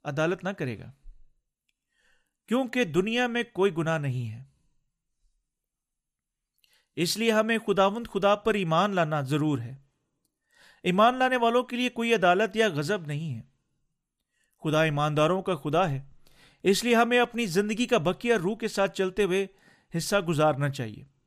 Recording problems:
none

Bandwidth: 15 kHz